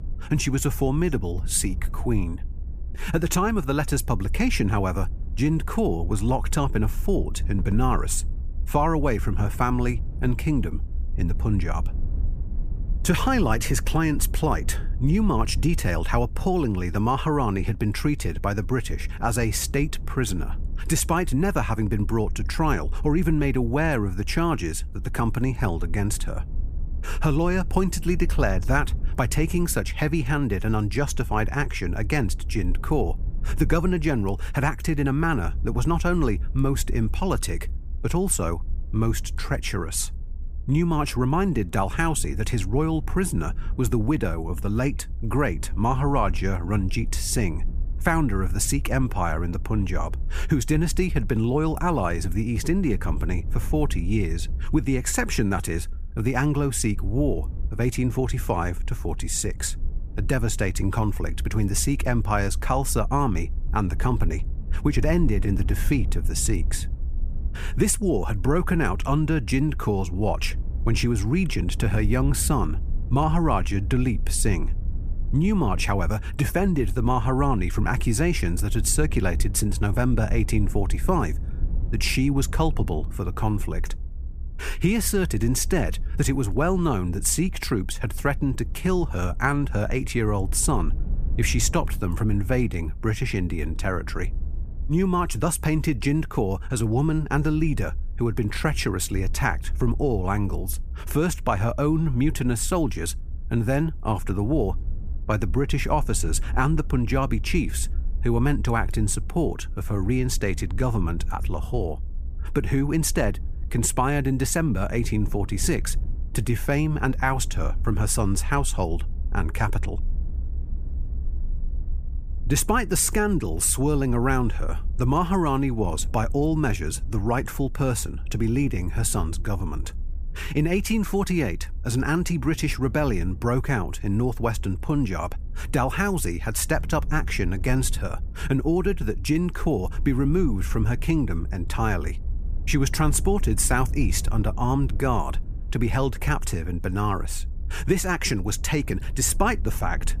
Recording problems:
low rumble; faint; throughout; 25 dB below the speech

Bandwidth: 15 kHz